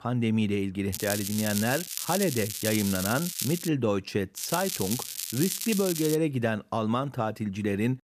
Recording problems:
crackling; loud; from 1 to 3.5 s and from 4.5 to 6 s; 4 dB below the speech

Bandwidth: 14.5 kHz